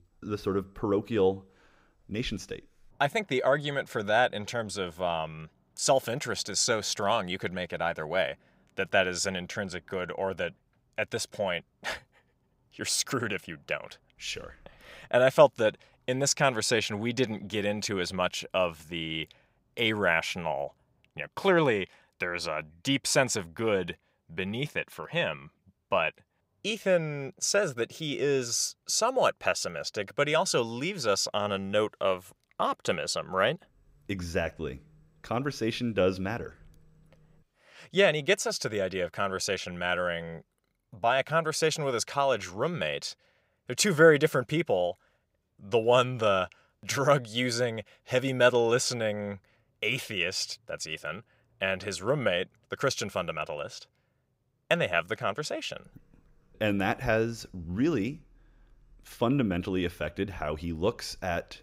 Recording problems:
none

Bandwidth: 15.5 kHz